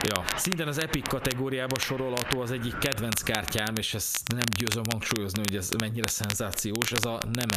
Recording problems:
squashed, flat; heavily, background pumping
crackle, like an old record; loud; 3 dB below the speech
wind in the background; noticeable; until 3 s; 10 dB below the speech
abrupt cut into speech; at the end

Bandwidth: 14.5 kHz